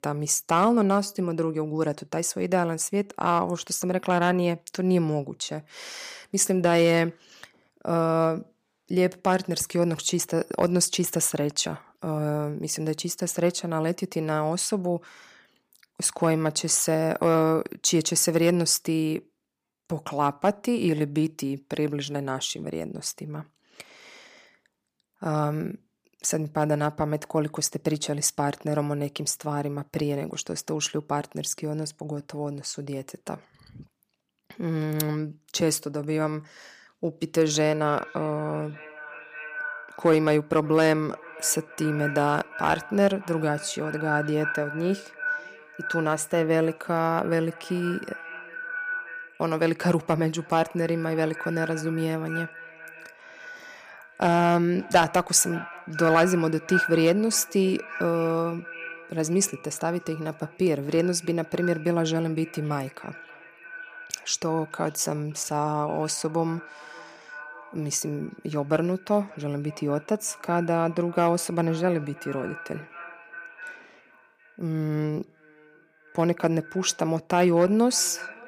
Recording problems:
echo of what is said; strong; from 37 s on; 580 ms later, 10 dB below the speech

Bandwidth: 15 kHz